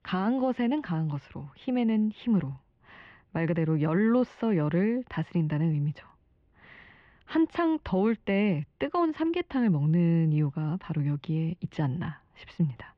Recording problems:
muffled; very; fading above 3 kHz

